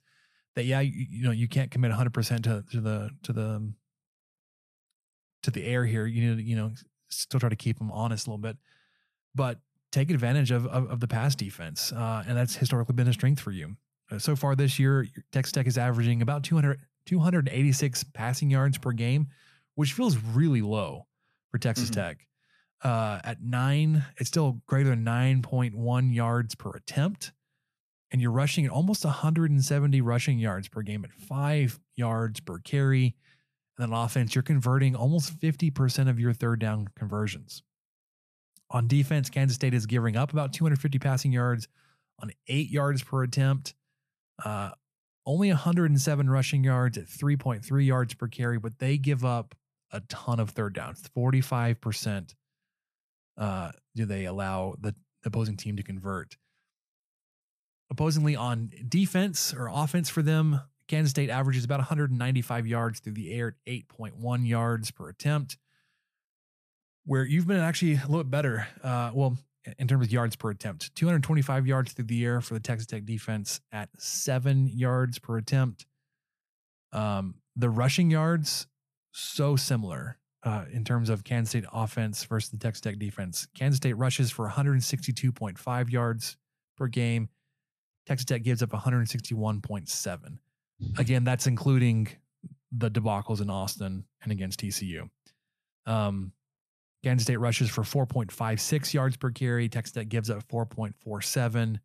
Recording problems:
none

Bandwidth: 14.5 kHz